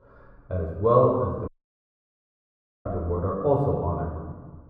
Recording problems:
muffled; very; fading above 1.5 kHz
room echo; noticeable; dies away in 1.2 s
off-mic speech; somewhat distant
audio cutting out; at 1.5 s for 1.5 s

